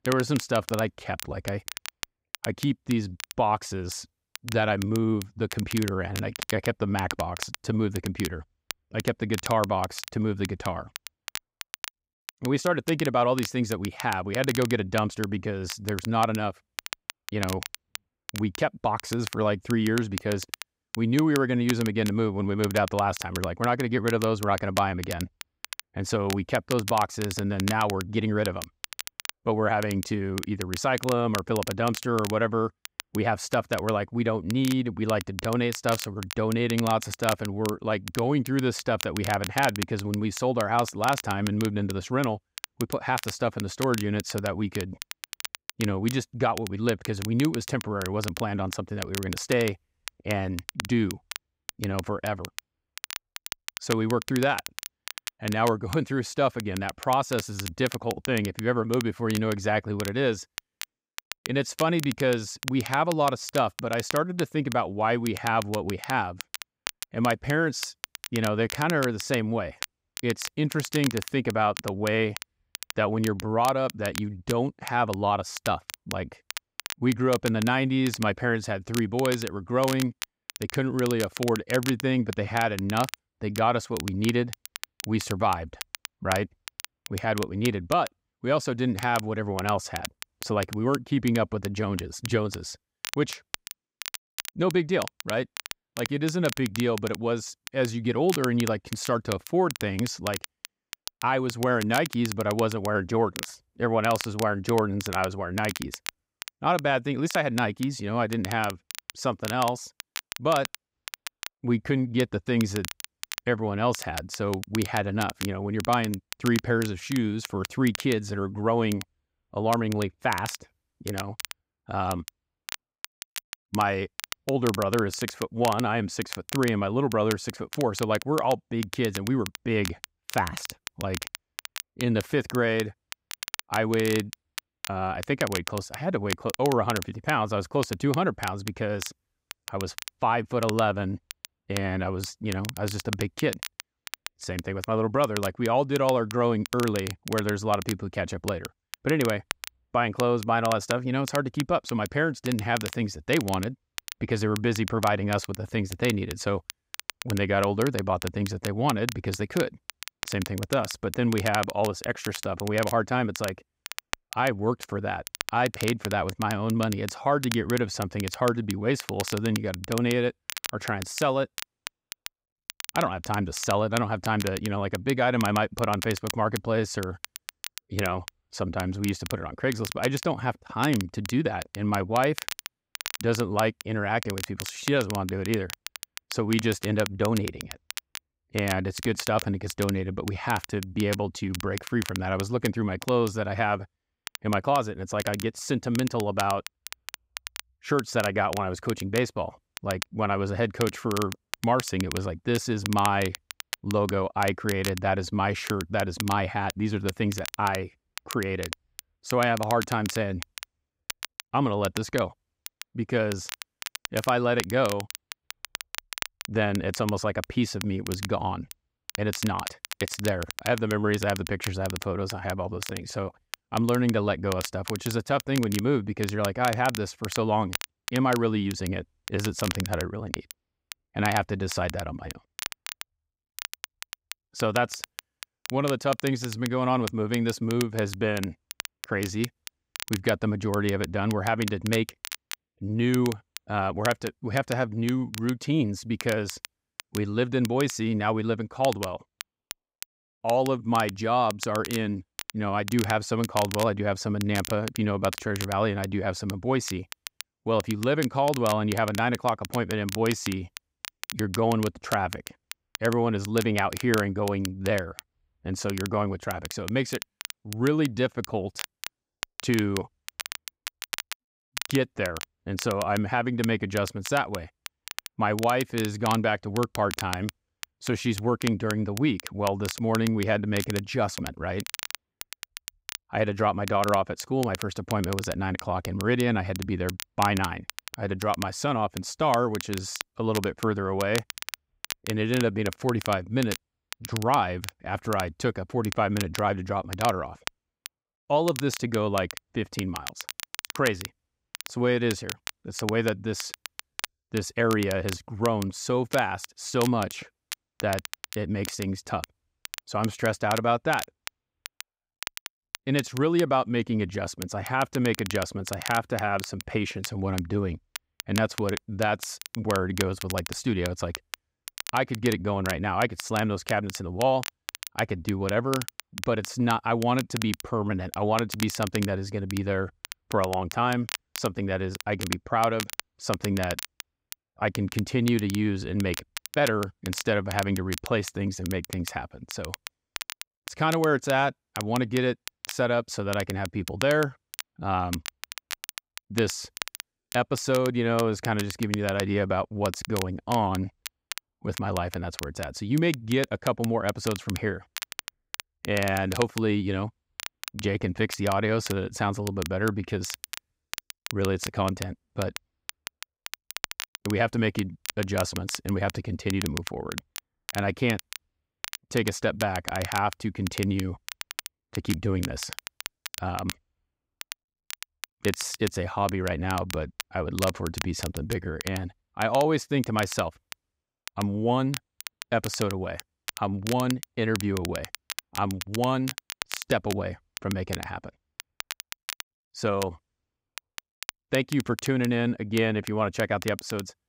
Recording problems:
crackle, like an old record; noticeable; 10 dB below the speech

